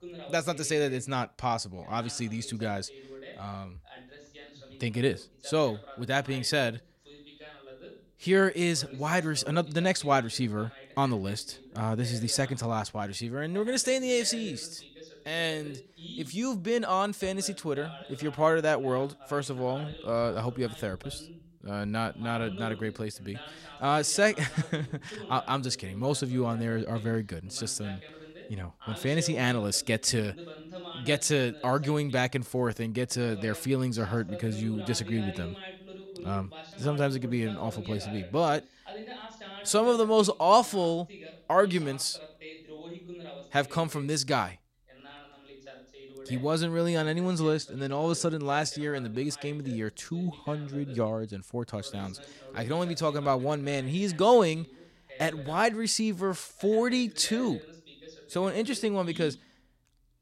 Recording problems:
voice in the background; noticeable; throughout; 20 dB below the speech

